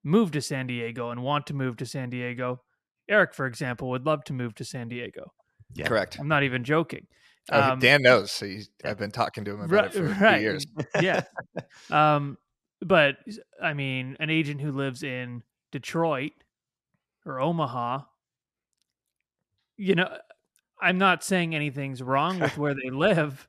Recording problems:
none

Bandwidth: 14 kHz